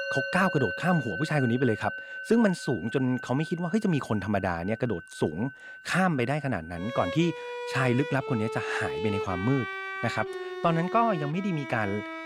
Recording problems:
background music; loud; throughout; 8 dB below the speech

